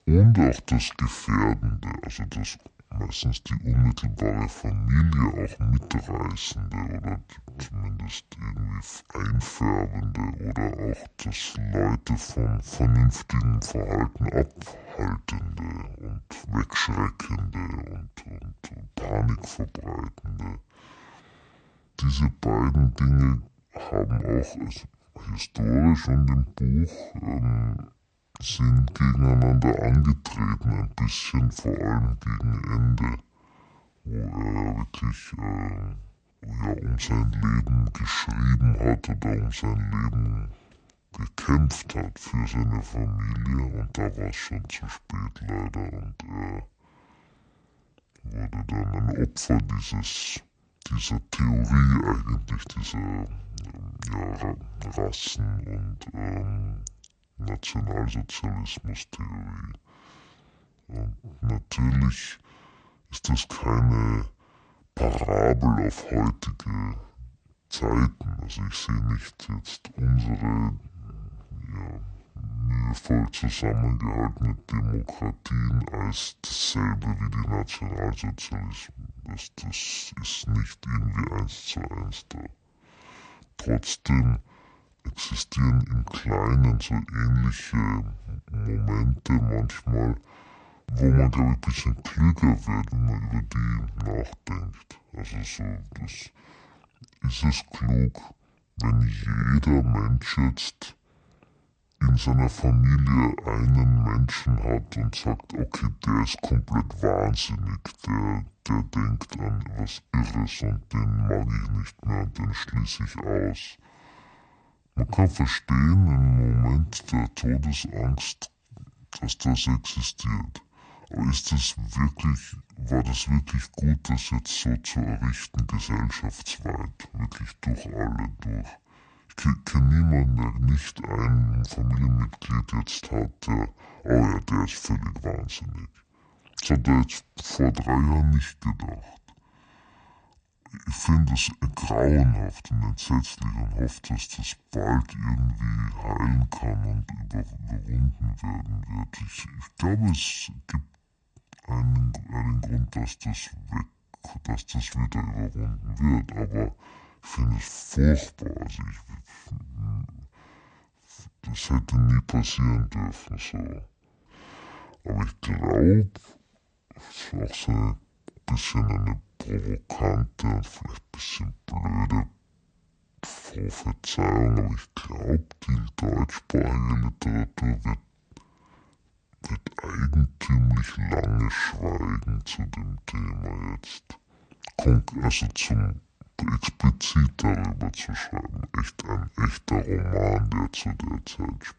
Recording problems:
wrong speed and pitch; too slow and too low; 0.6 times normal speed

